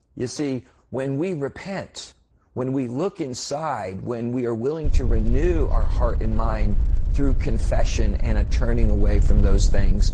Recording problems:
garbled, watery; slightly
wind noise on the microphone; occasional gusts; from 5 s on; 15 dB below the speech

